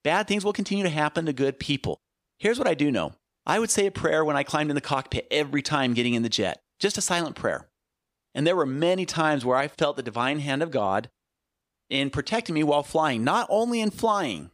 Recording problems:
none

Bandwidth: 15 kHz